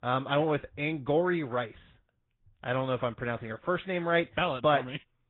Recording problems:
high frequencies cut off; severe; nothing above 3.5 kHz
garbled, watery; slightly

